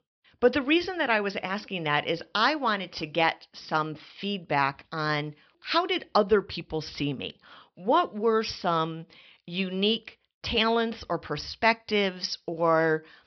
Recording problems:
high frequencies cut off; noticeable; nothing above 5.5 kHz

